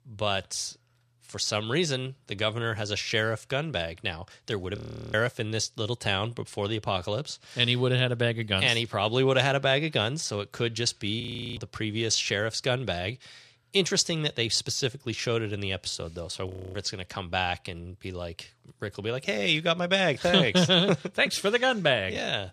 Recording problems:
audio freezing; at 5 s, at 11 s and at 16 s

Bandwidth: 14 kHz